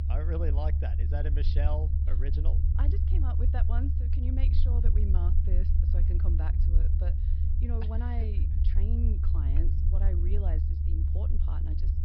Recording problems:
high frequencies cut off; noticeable; nothing above 5.5 kHz
low rumble; loud; throughout; 2 dB below the speech

